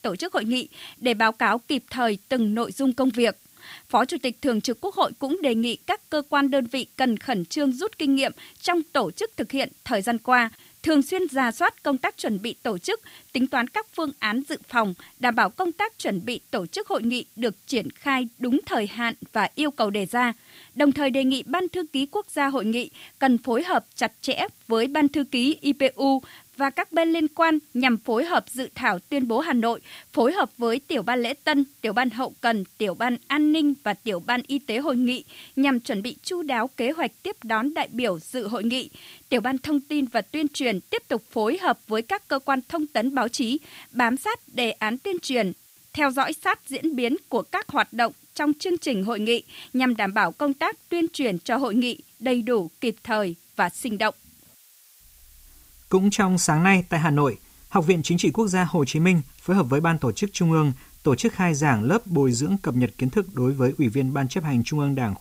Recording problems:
hiss; faint; throughout; 25 dB below the speech

